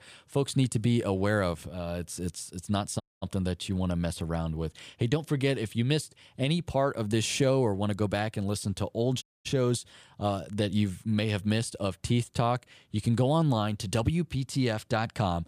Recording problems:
audio cutting out; at 3 s and at 9 s

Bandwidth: 15 kHz